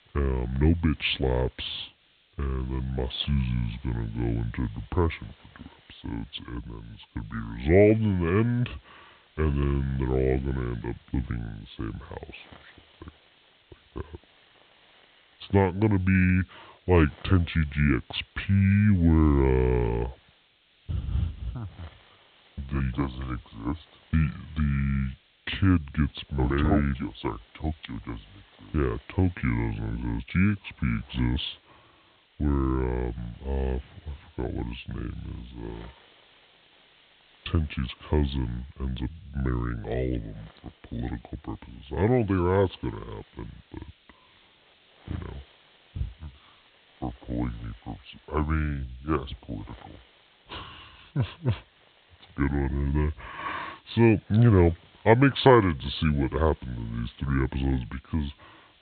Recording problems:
high frequencies cut off; severe; nothing above 4 kHz
wrong speed and pitch; too slow and too low; 0.7 times normal speed
hiss; faint; throughout; 30 dB below the speech

